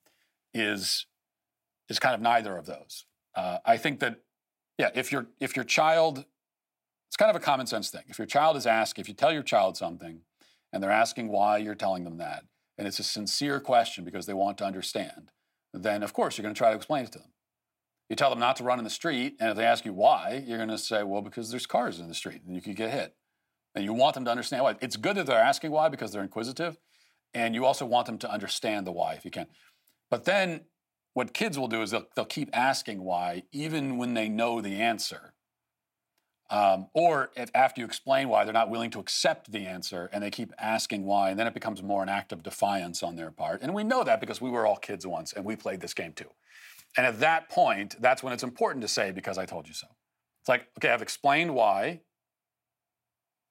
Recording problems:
thin; somewhat; fading below 300 Hz

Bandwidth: 16 kHz